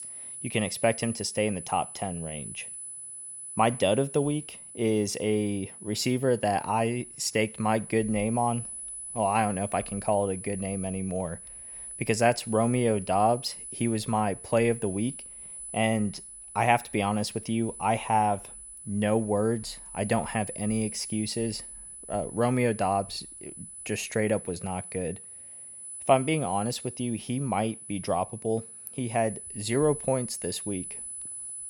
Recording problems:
high-pitched whine; noticeable; throughout; 10 kHz, 10 dB below the speech

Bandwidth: 17.5 kHz